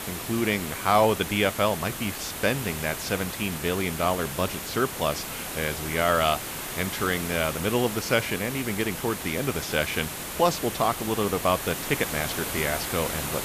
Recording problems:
hiss; loud; throughout; 5 dB below the speech

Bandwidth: 14.5 kHz